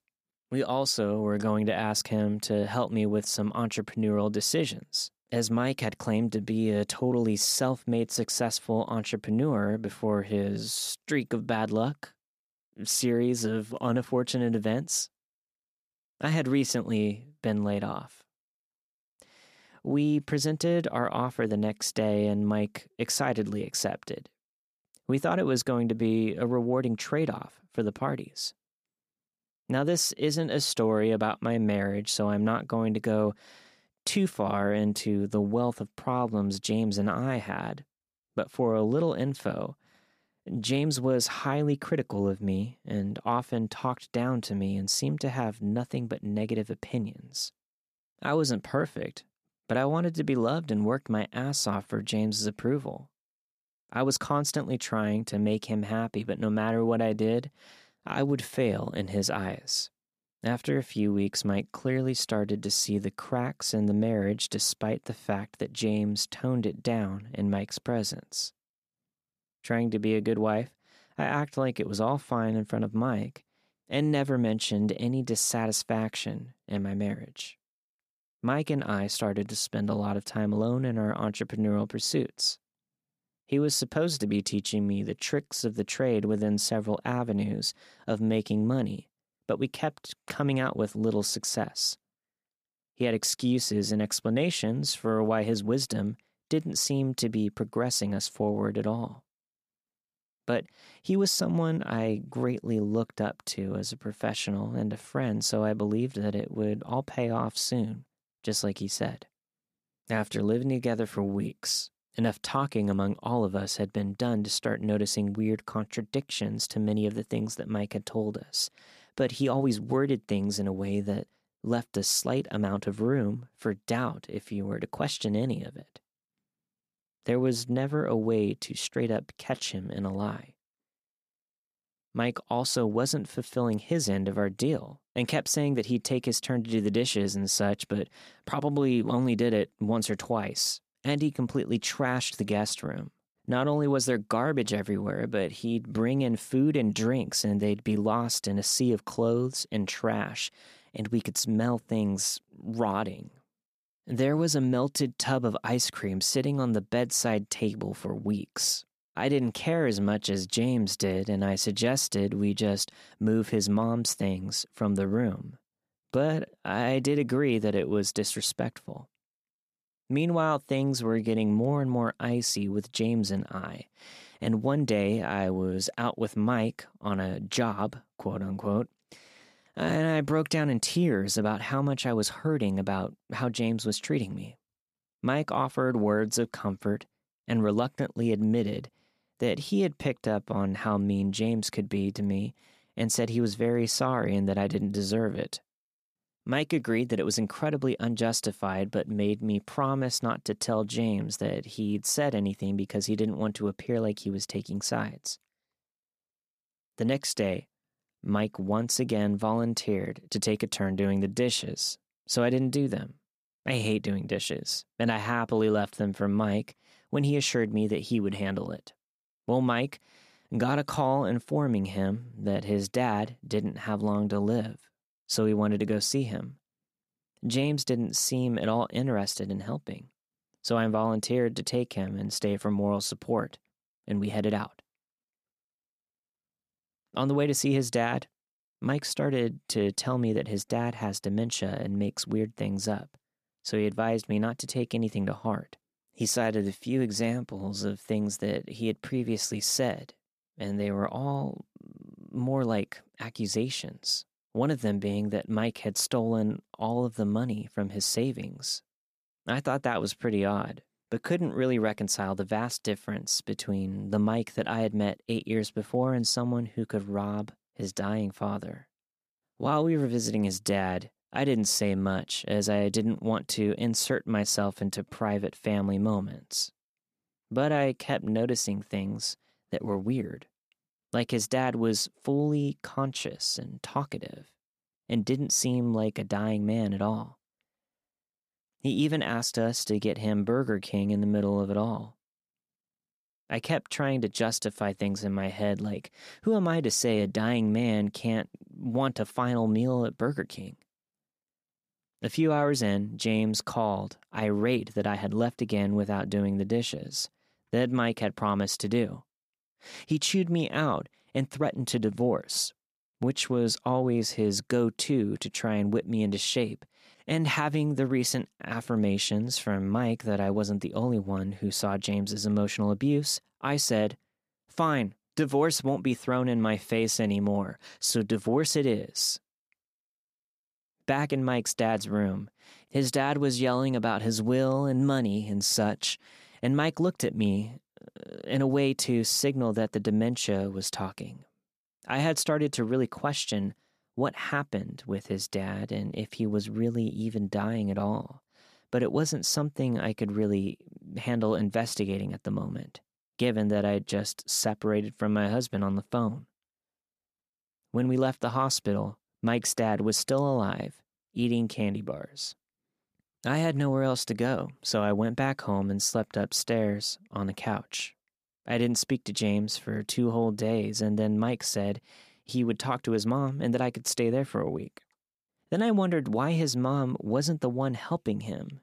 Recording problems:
none

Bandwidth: 14.5 kHz